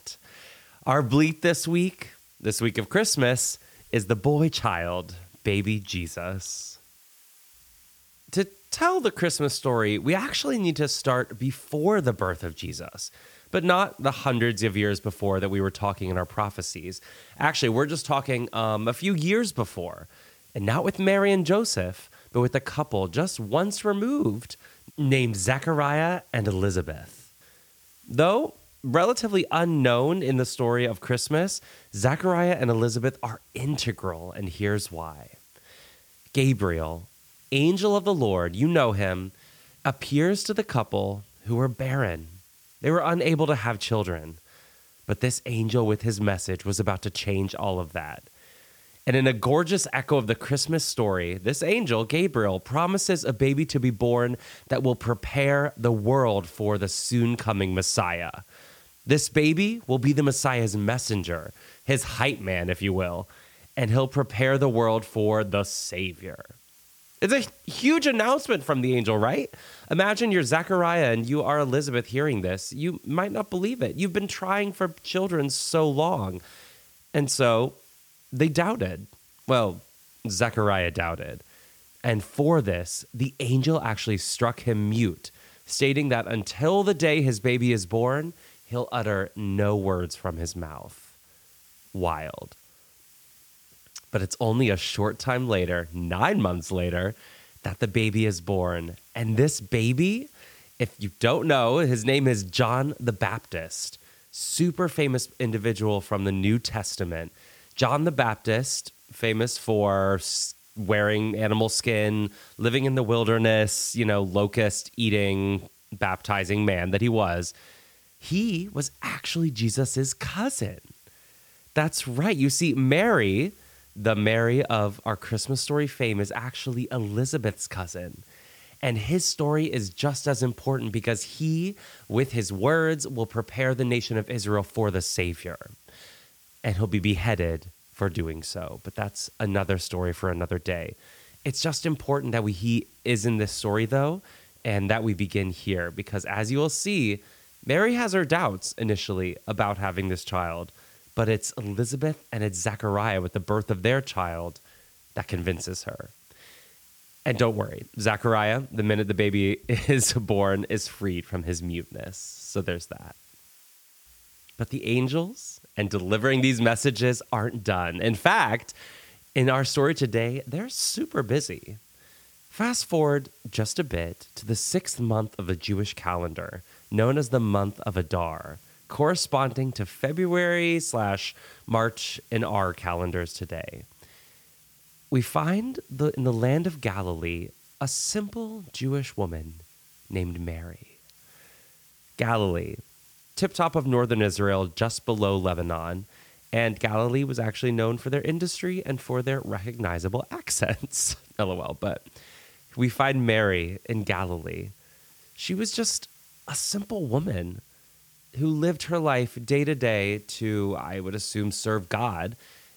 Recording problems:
hiss; faint; throughout; 30 dB below the speech

